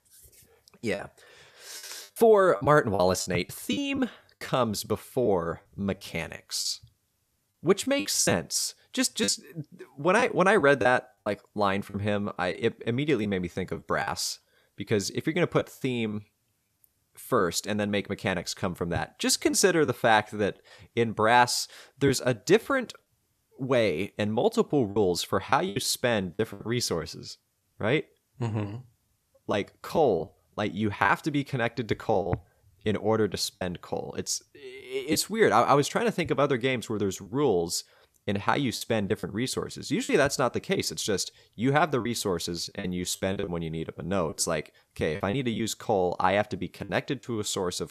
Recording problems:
choppy; very; 6% of the speech affected

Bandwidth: 14.5 kHz